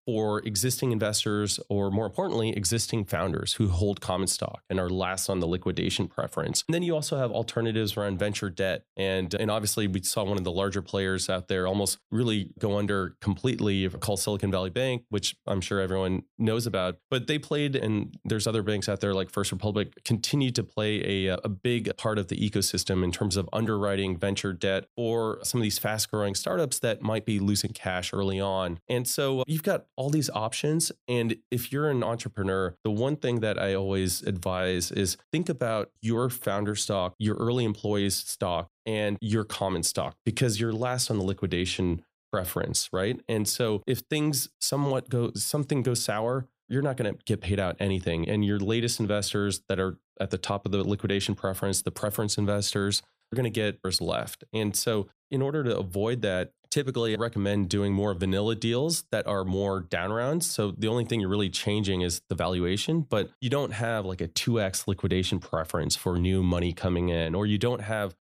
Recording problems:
none

